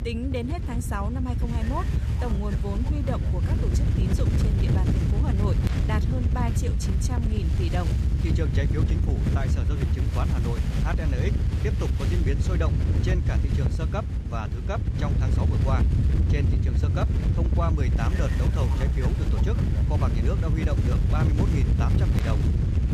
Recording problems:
wind noise on the microphone; heavy; 1 dB below the speech

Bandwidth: 14.5 kHz